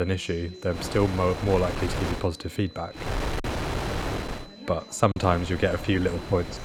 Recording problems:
wind noise on the microphone; heavy; from 1 to 2 s, from 3 to 4.5 s and from 5 s on; 6 dB below the speech
chatter from many people; noticeable; throughout; 20 dB below the speech
high-pitched whine; faint; throughout; 4 kHz, 20 dB below the speech
abrupt cut into speech; at the start
choppy; occasionally; at 5 s; 5% of the speech affected

